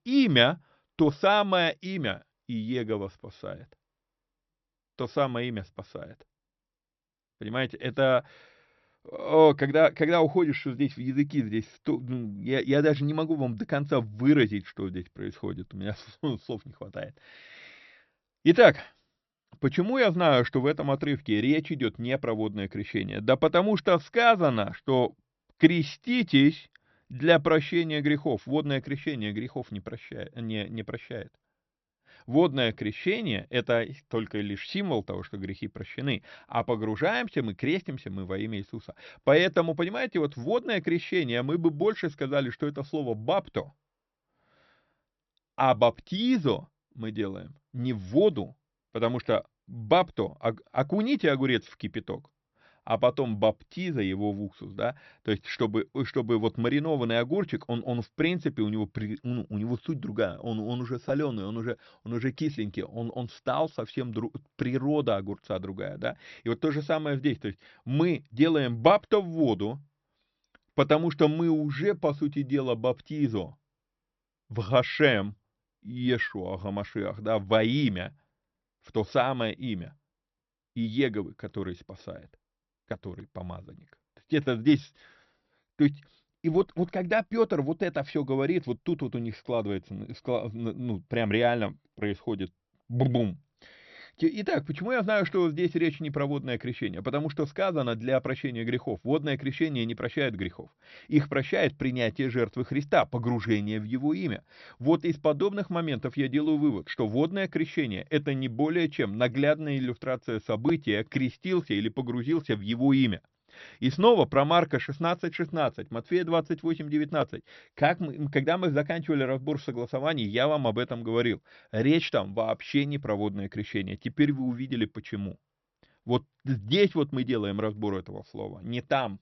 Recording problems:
high frequencies cut off; noticeable; nothing above 6 kHz

